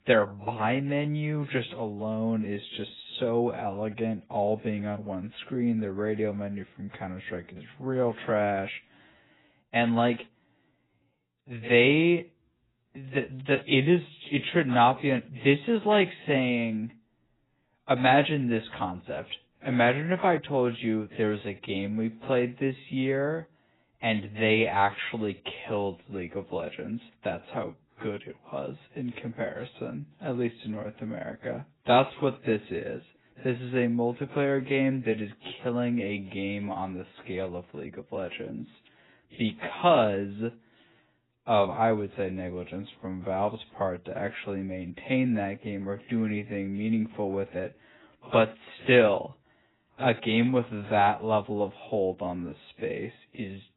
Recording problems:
garbled, watery; badly; nothing above 4 kHz
wrong speed, natural pitch; too slow; 0.7 times normal speed

